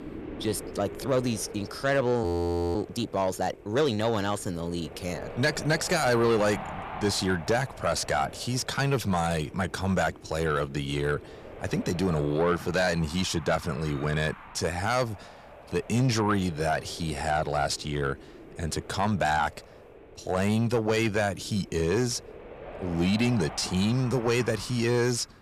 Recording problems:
distortion; slight; 10 dB below the speech
wind noise on the microphone; occasional gusts; 15 dB below the speech
audio freezing; at 2 s for 0.5 s

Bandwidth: 14.5 kHz